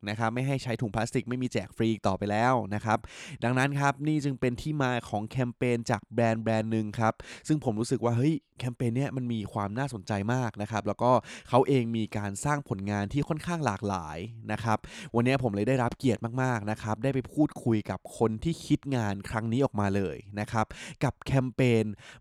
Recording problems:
none

